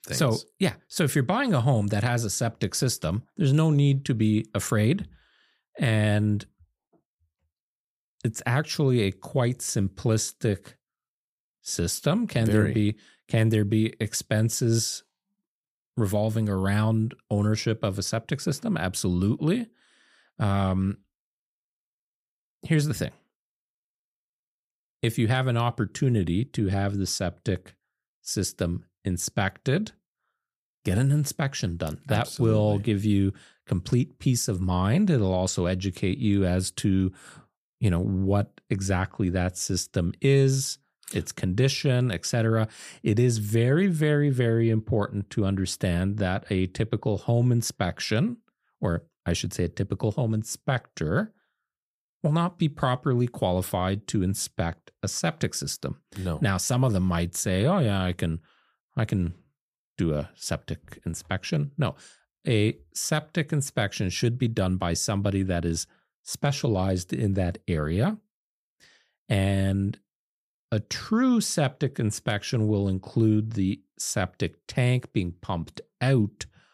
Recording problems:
none

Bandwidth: 15 kHz